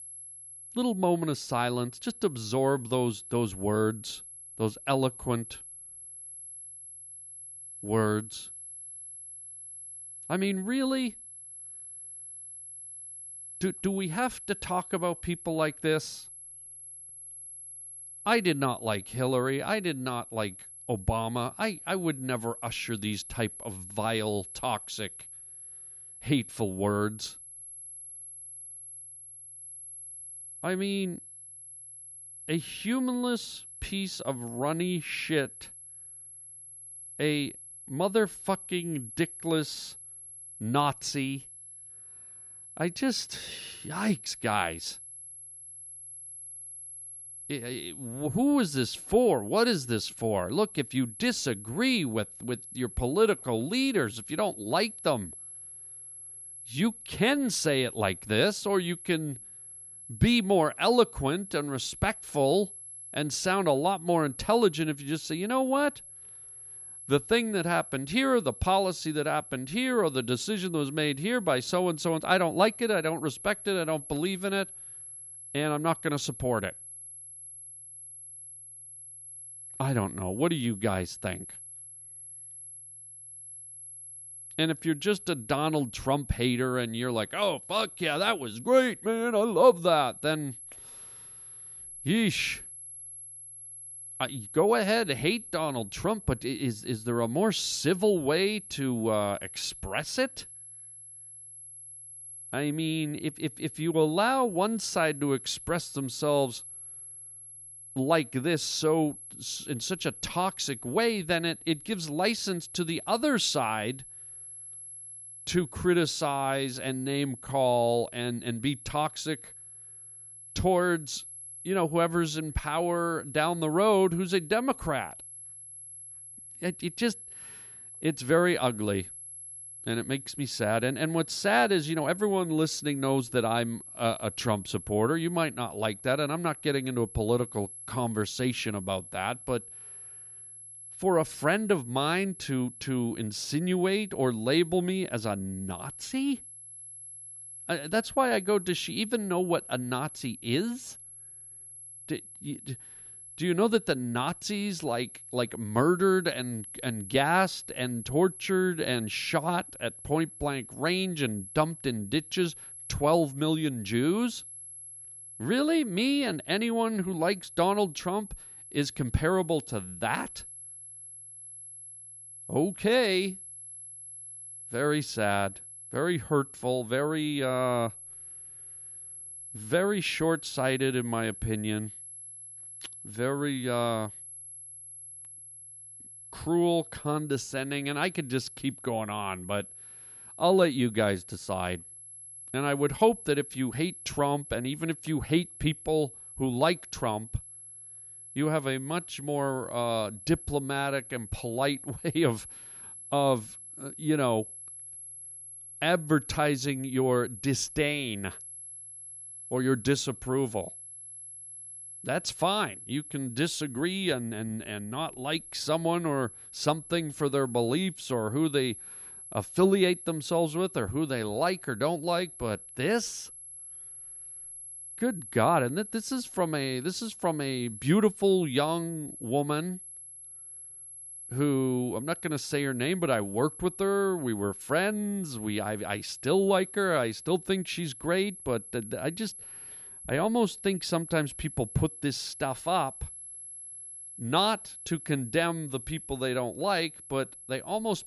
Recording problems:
high-pitched whine; noticeable; throughout; 11 kHz, 15 dB below the speech

